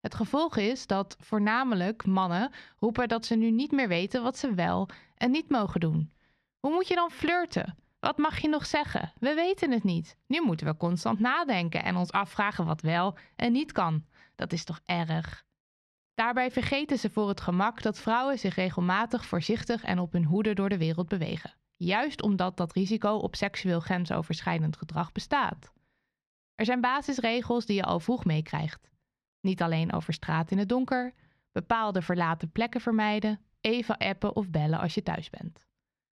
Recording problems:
muffled; slightly; fading above 3 kHz

